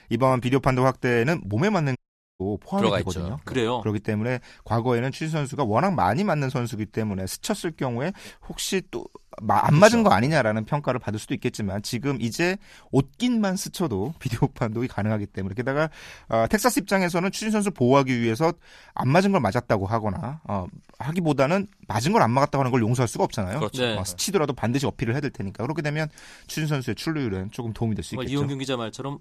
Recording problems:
audio cutting out; at 2 s

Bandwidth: 14 kHz